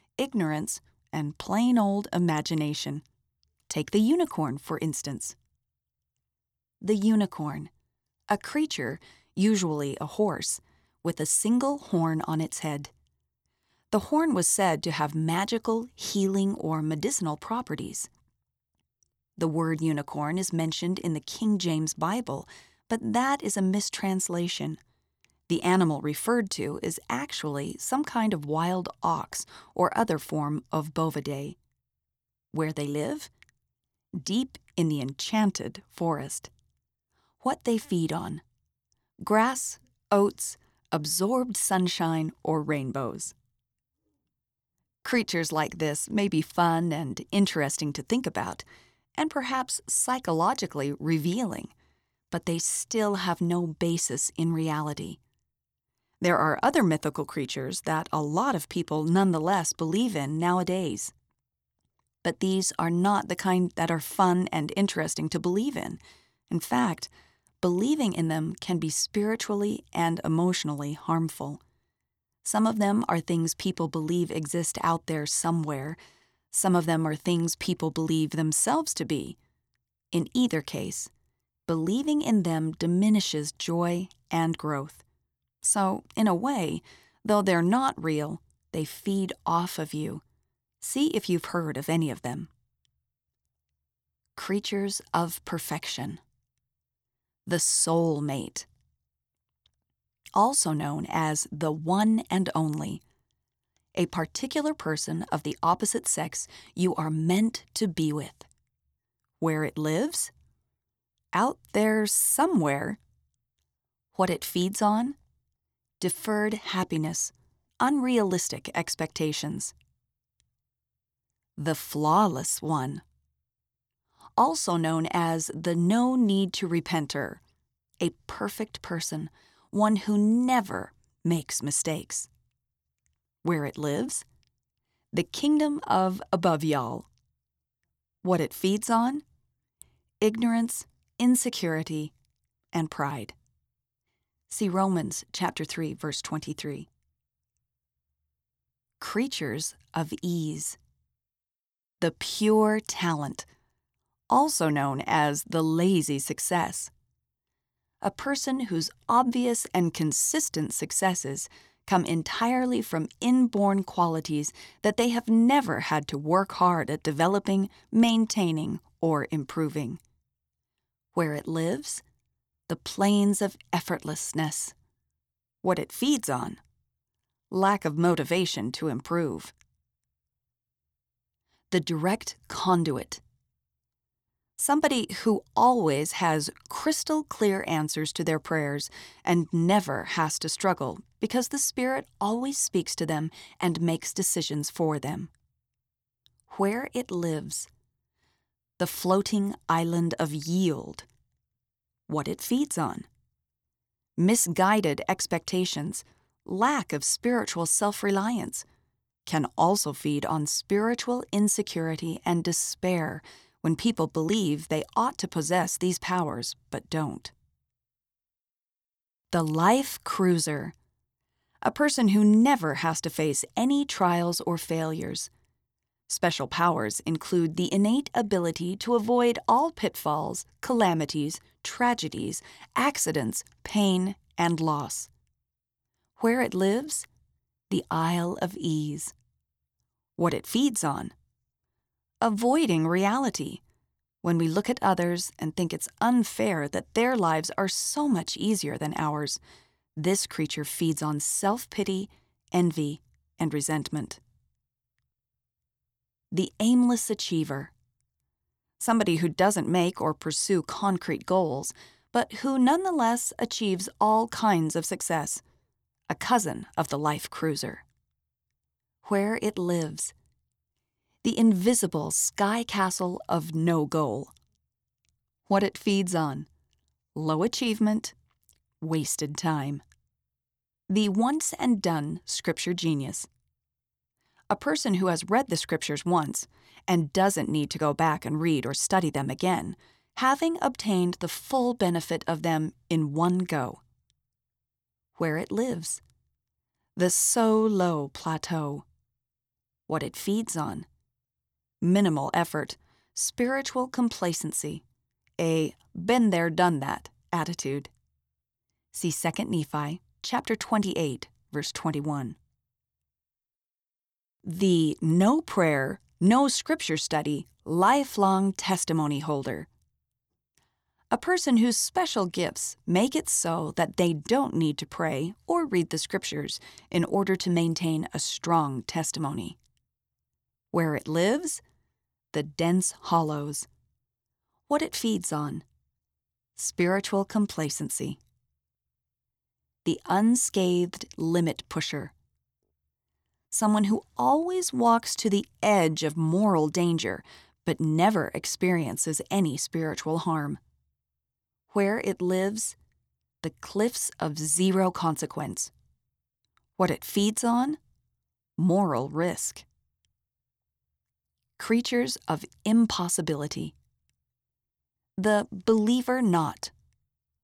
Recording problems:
none

